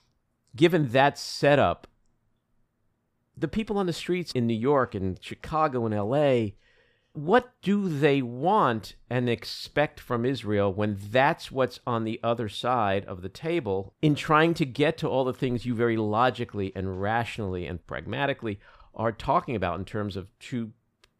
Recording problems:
none

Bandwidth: 15 kHz